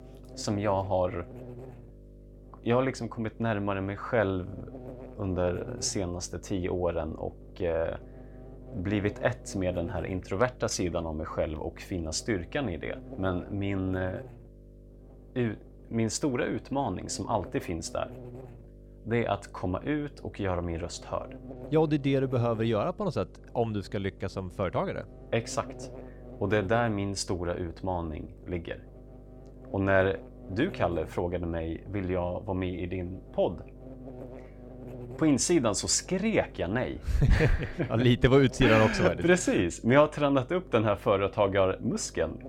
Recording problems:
electrical hum; faint; throughout; 50 Hz, 20 dB below the speech

